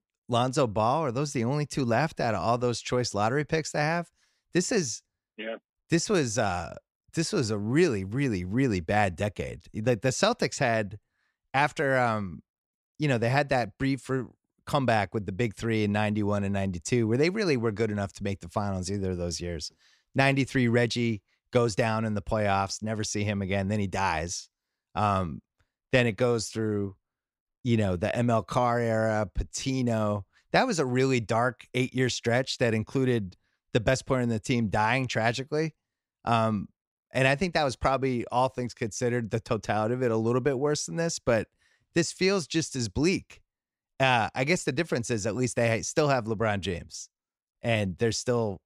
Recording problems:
none

